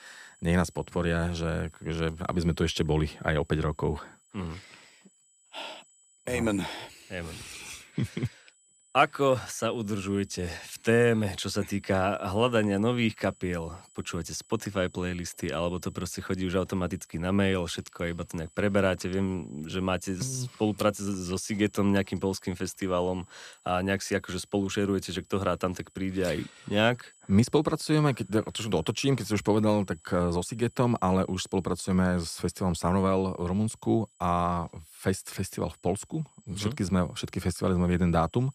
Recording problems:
high-pitched whine; faint; throughout; 8 kHz, 30 dB below the speech

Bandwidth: 14.5 kHz